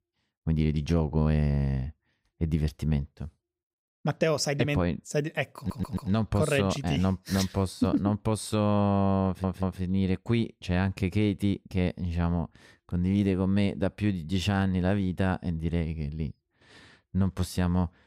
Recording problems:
audio stuttering; at 5.5 s and at 9.5 s

